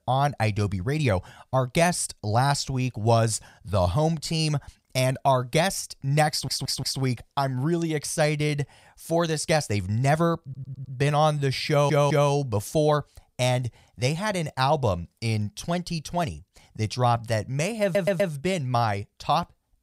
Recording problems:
audio stuttering; 4 times, first at 6.5 s

